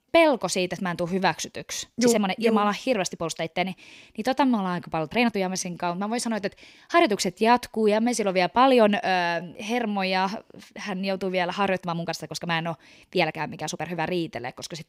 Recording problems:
uneven, jittery; strongly; from 1 to 14 s

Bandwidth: 15.5 kHz